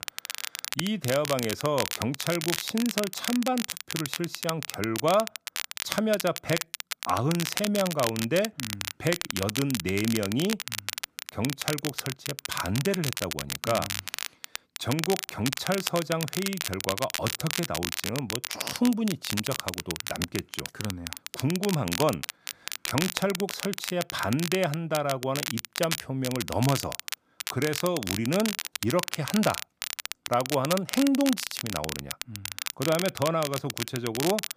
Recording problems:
crackle, like an old record; loud; 4 dB below the speech

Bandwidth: 15 kHz